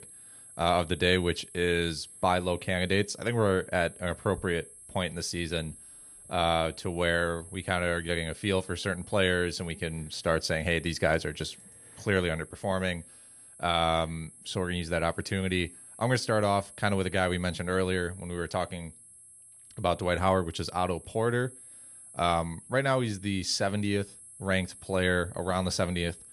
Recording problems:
high-pitched whine; noticeable; throughout; 11 kHz, 20 dB below the speech

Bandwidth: 13.5 kHz